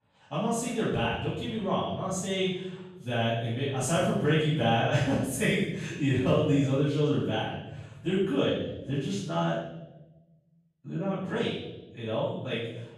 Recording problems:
room echo; strong; dies away in 0.9 s
off-mic speech; far

